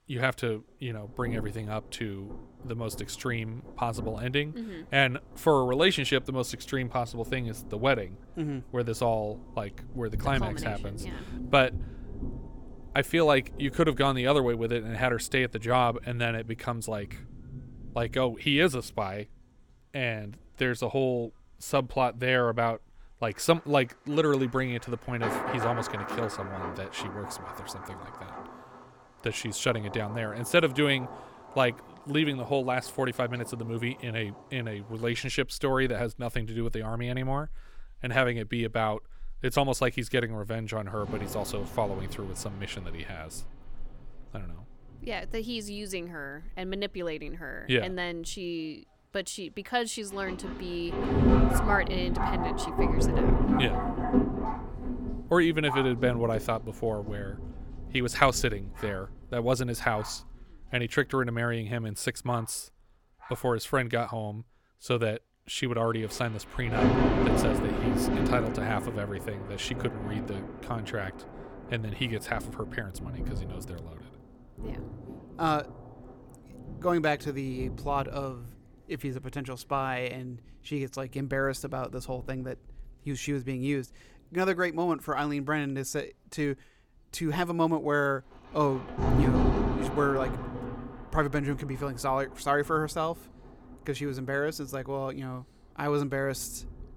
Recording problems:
rain or running water; loud; throughout; 4 dB below the speech

